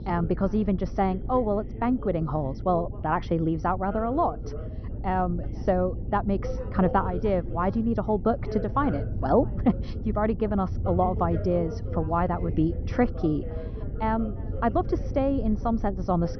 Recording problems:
high frequencies cut off; noticeable; nothing above 6 kHz
muffled; very slightly; fading above 1.5 kHz
background chatter; noticeable; throughout; 2 voices, 15 dB below the speech
low rumble; noticeable; throughout; 20 dB below the speech

